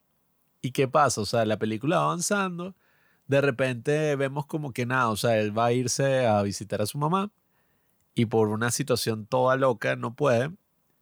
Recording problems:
none

